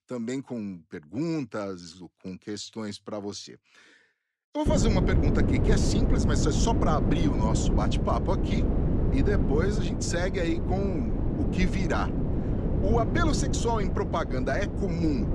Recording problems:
wind noise on the microphone; heavy; from 4.5 s on; 3 dB below the speech

